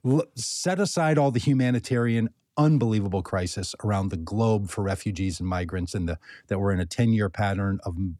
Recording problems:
none

